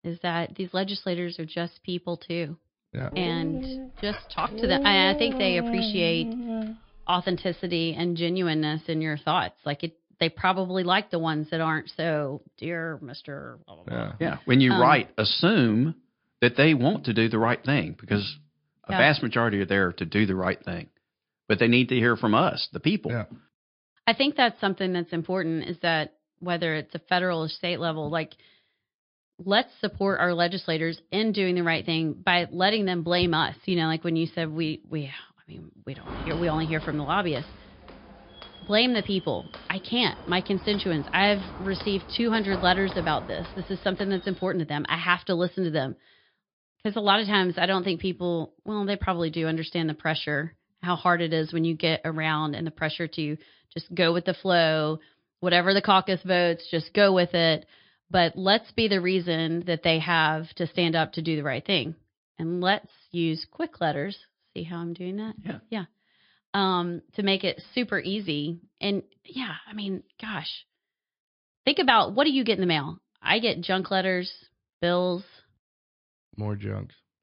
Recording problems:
high frequencies cut off; noticeable; nothing above 5 kHz
garbled, watery; slightly
dog barking; noticeable; from 3 to 7 s; peak 2 dB below the speech
footsteps; noticeable; from 36 to 44 s; peak 10 dB below the speech

